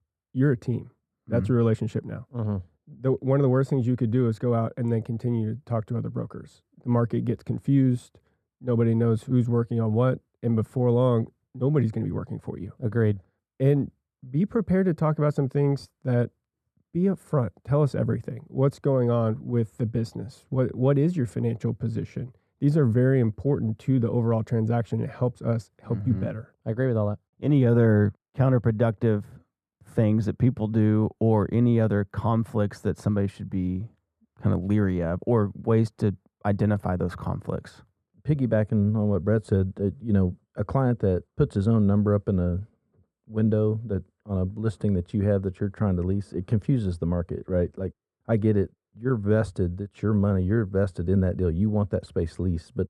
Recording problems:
muffled; very; fading above 2 kHz

